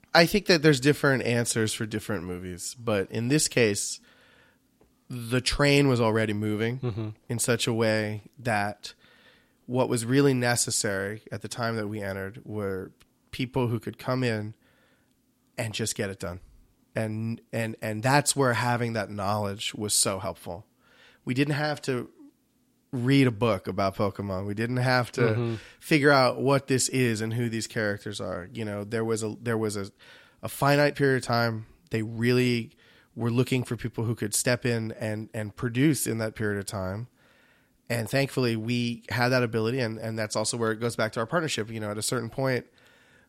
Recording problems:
none

